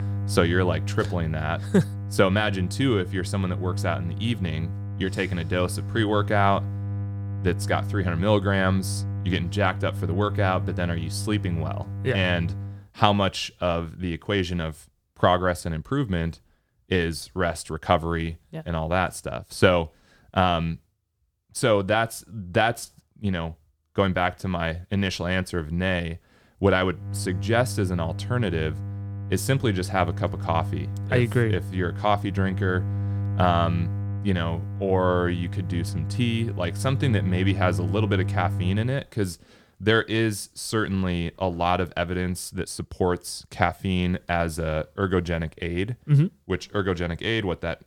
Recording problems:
electrical hum; noticeable; until 13 s and from 27 to 39 s; 50 Hz, 15 dB below the speech

